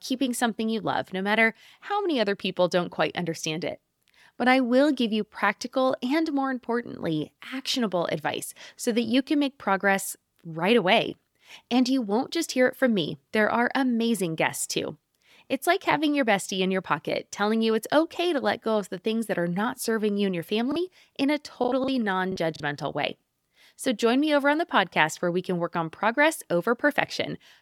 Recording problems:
choppy; very; from 21 to 23 s; 9% of the speech affected

